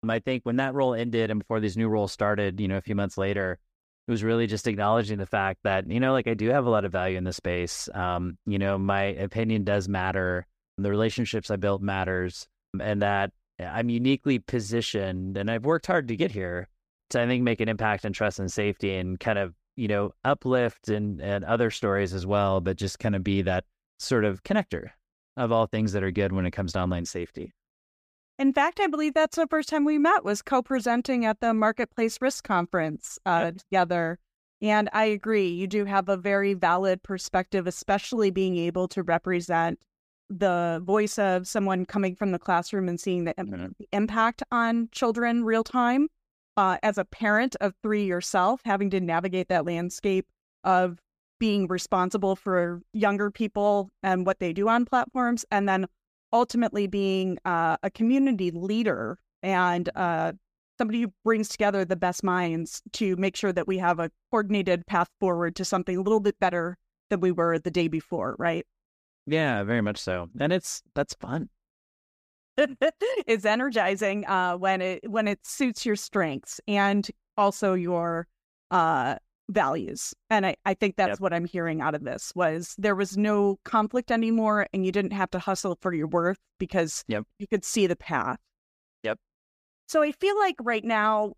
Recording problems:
none

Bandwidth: 15 kHz